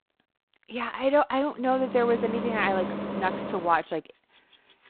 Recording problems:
phone-call audio; poor line; nothing above 4 kHz
traffic noise; loud; from 2 s on; 7 dB below the speech

